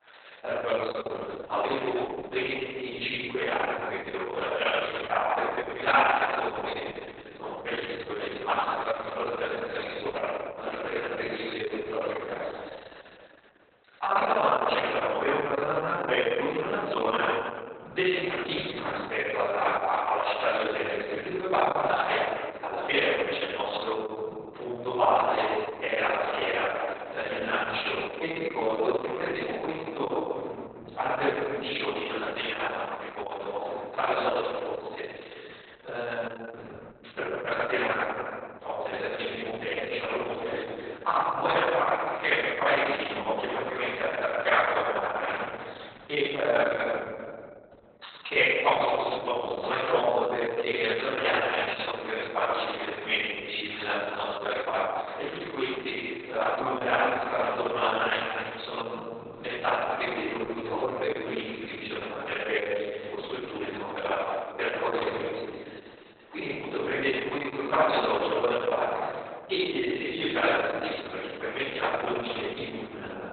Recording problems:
room echo; strong; dies away in 2 s
off-mic speech; far
garbled, watery; badly; nothing above 4 kHz
thin; very; fading below 550 Hz

